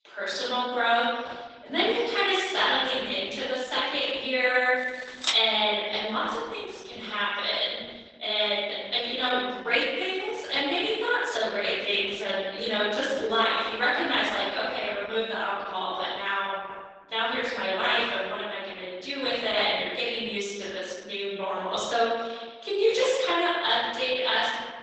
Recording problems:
room echo; strong; dies away in 1.3 s
off-mic speech; far
garbled, watery; badly; nothing above 8 kHz
thin; very slightly; fading below 300 Hz
keyboard typing; noticeable; at 5 s; peak 2 dB below the speech

